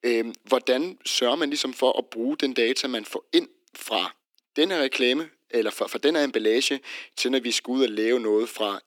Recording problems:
thin; somewhat; fading below 300 Hz

